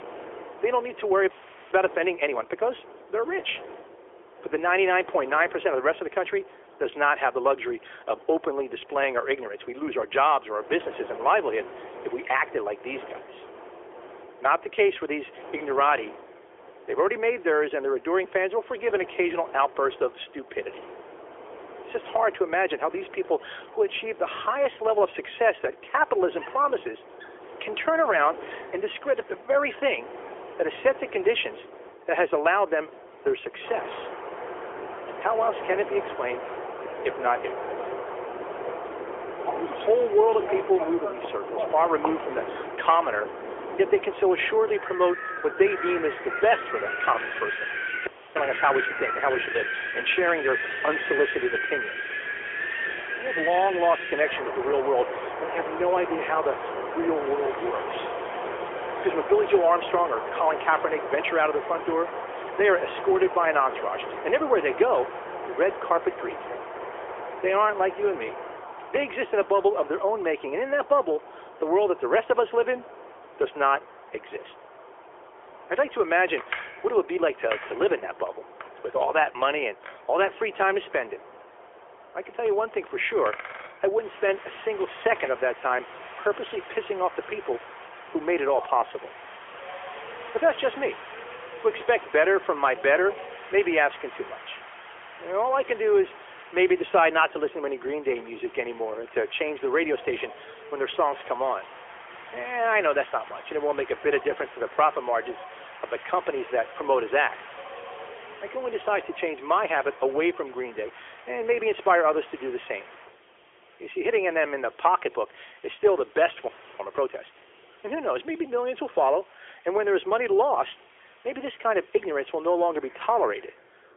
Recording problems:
phone-call audio; nothing above 3.5 kHz
wind in the background; loud; throughout; 10 dB below the speech
audio freezing; at 1.5 s, at 48 s and at 1:56

